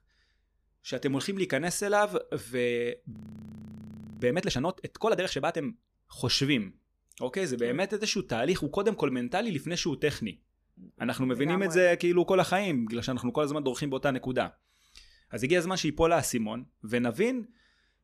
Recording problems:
audio freezing; at 3 s for 1 s

